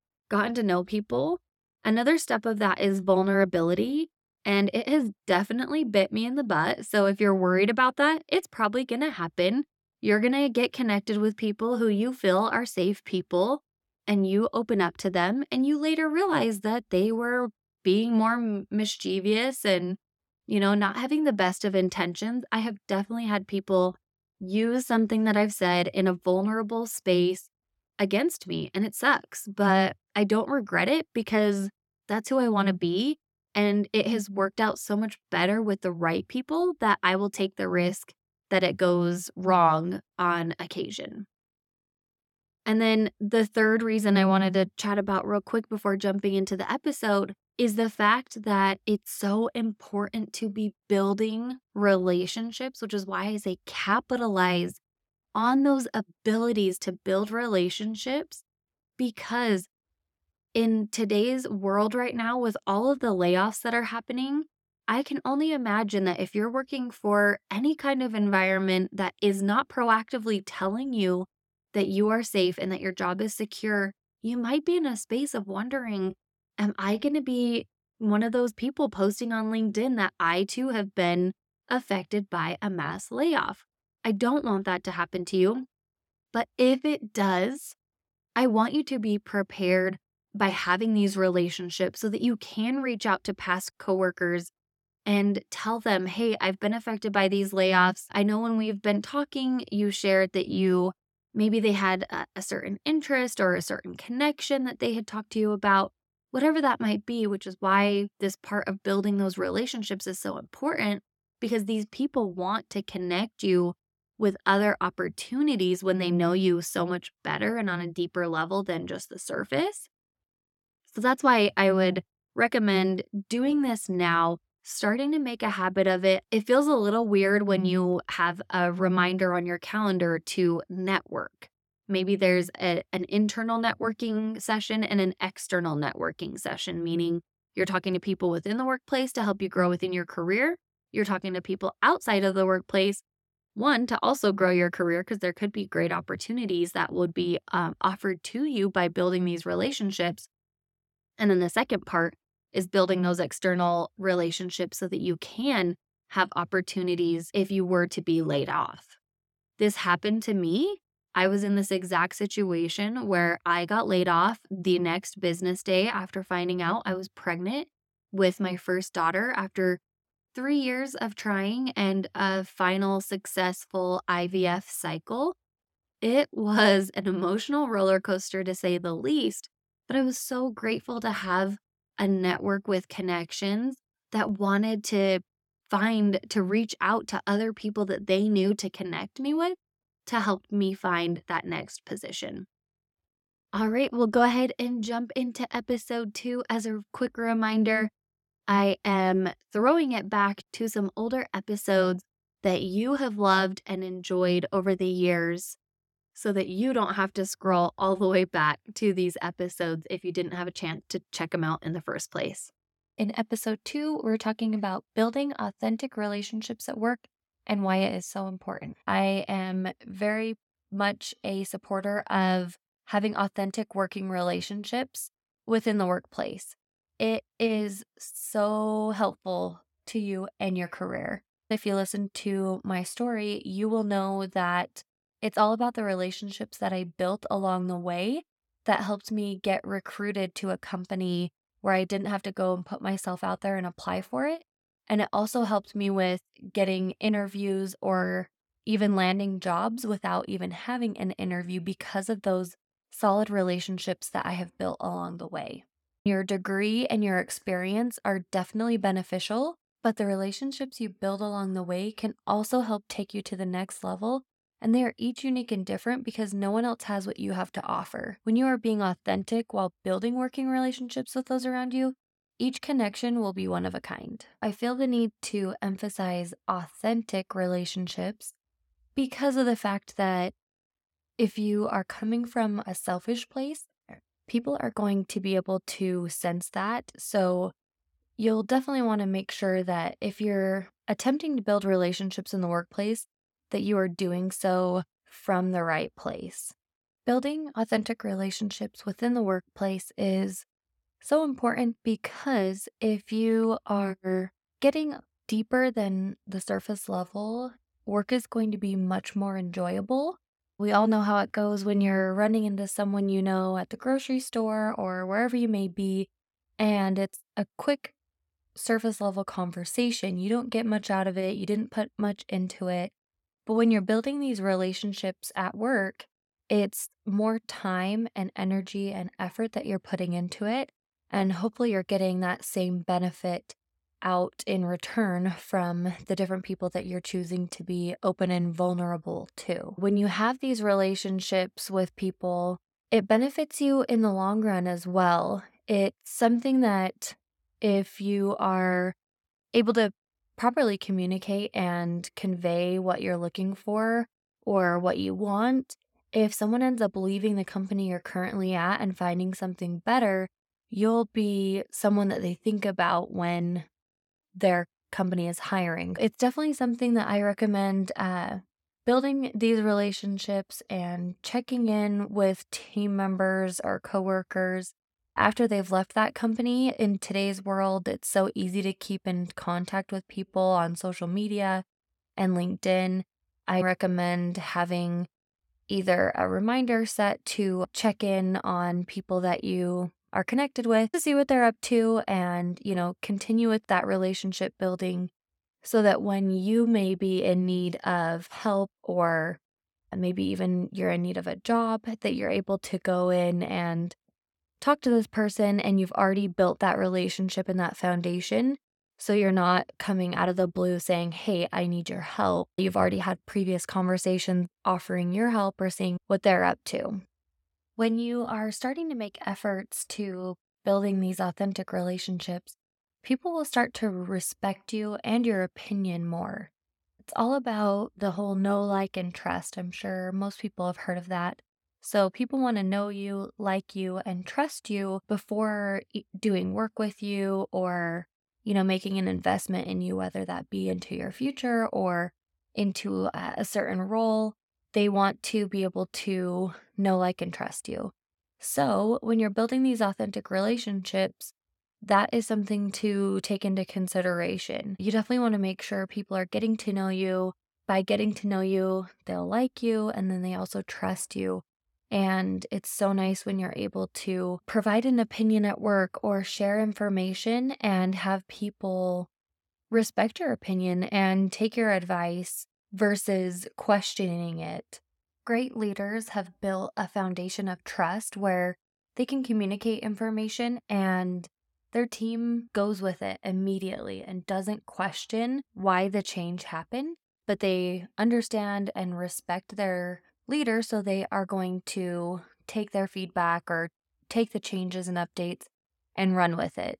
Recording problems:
none

